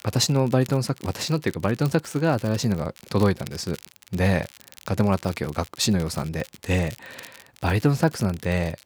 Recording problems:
crackle, like an old record; faint; 20 dB below the speech

